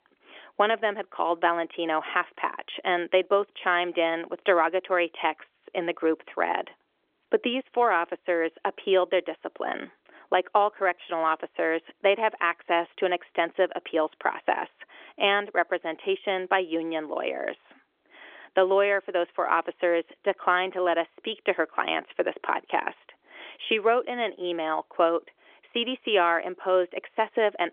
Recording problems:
phone-call audio; nothing above 3.5 kHz

